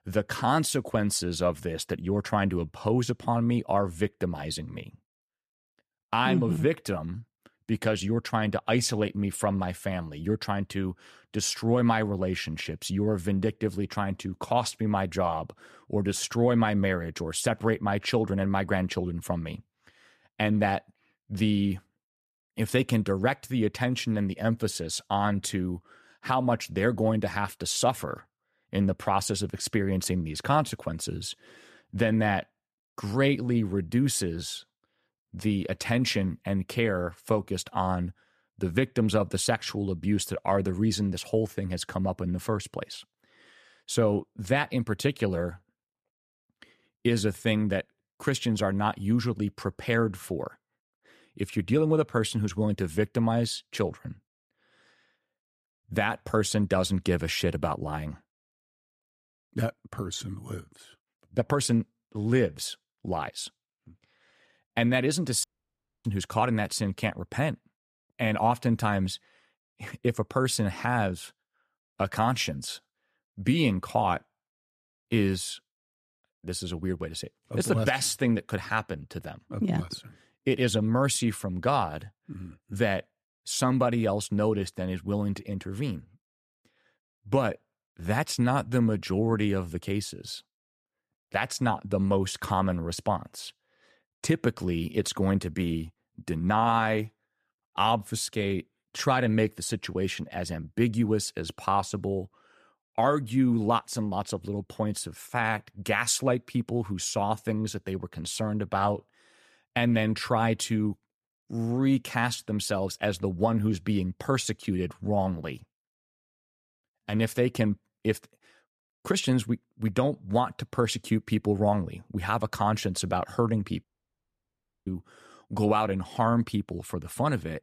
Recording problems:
audio cutting out; at 1:05 for 0.5 s and at 2:04 for 1 s

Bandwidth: 14.5 kHz